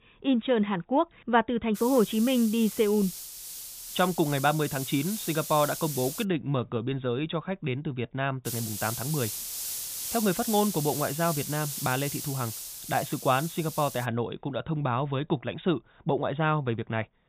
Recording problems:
high frequencies cut off; severe; nothing above 4 kHz
hiss; loud; from 2 to 6 s and from 8.5 to 14 s; 7 dB below the speech

